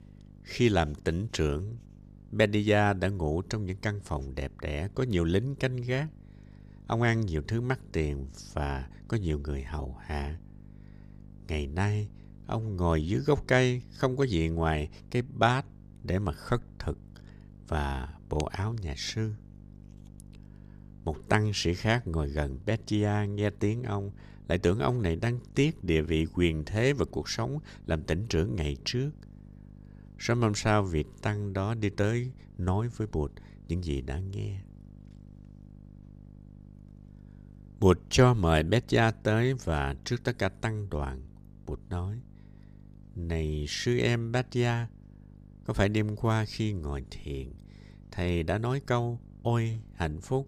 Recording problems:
electrical hum; faint; throughout; 50 Hz, 30 dB below the speech

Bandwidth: 14.5 kHz